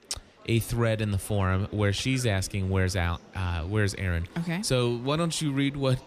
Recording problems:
murmuring crowd; faint; throughout; 25 dB below the speech

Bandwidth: 14.5 kHz